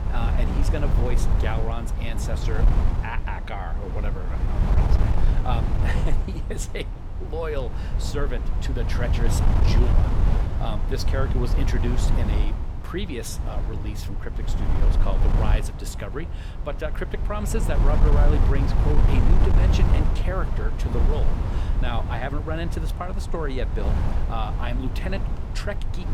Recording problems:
wind noise on the microphone; heavy; 3 dB below the speech

